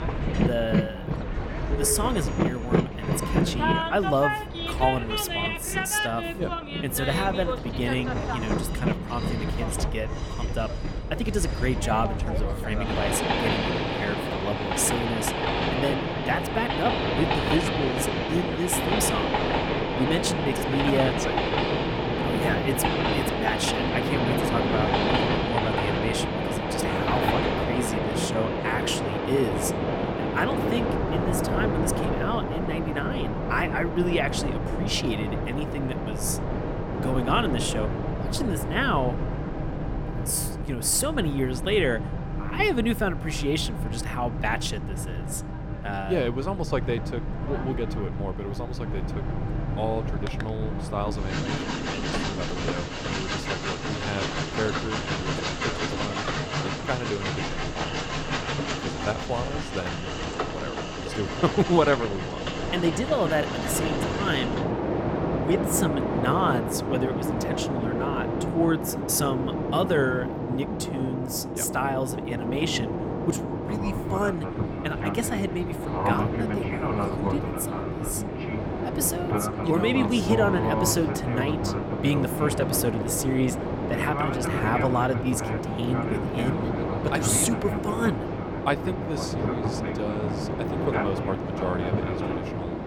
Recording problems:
train or aircraft noise; very loud; throughout; 1 dB above the speech

